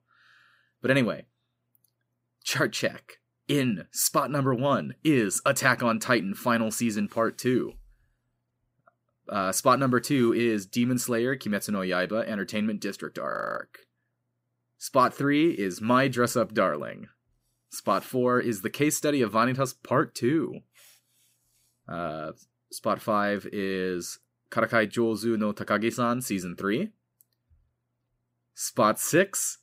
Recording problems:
audio freezing; at 13 s

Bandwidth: 15.5 kHz